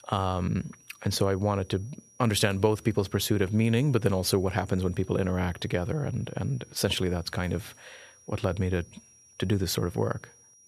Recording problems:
high-pitched whine; faint; throughout; 6 kHz, 25 dB below the speech

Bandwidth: 13.5 kHz